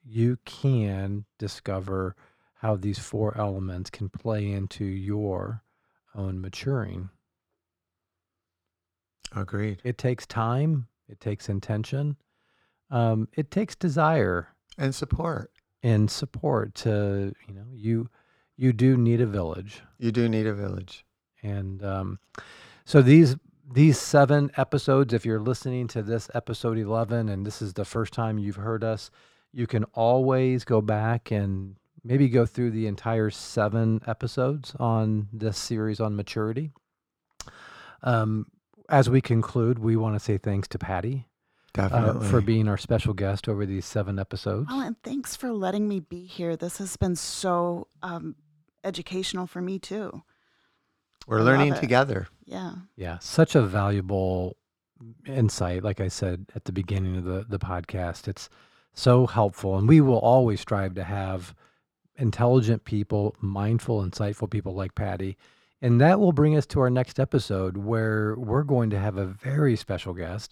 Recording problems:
muffled; slightly; fading above 3.5 kHz

